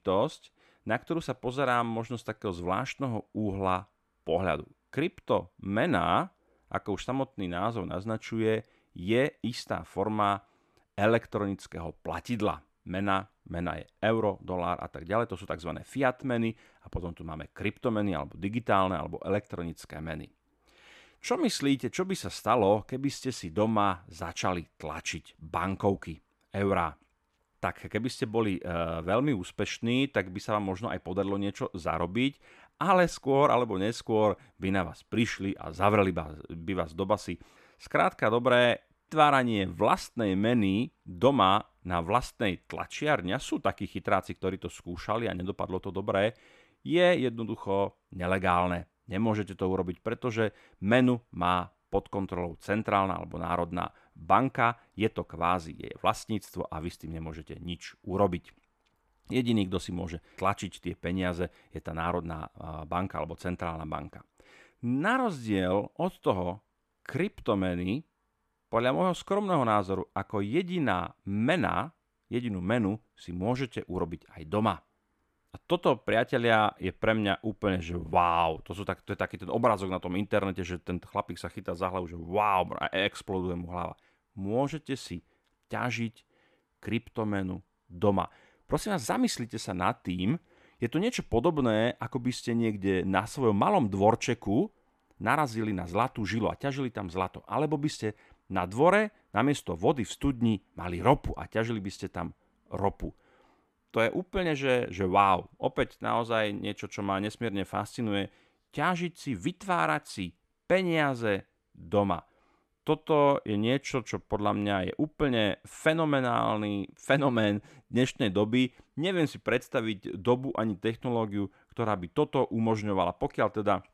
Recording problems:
none

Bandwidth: 14.5 kHz